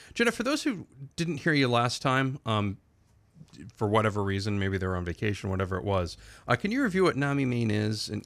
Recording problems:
none

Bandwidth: 14.5 kHz